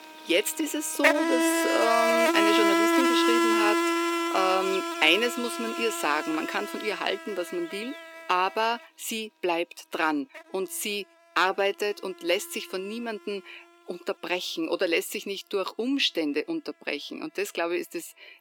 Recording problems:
thin; somewhat; fading below 300 Hz
animal sounds; very loud; throughout; 3 dB above the speech

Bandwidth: 17 kHz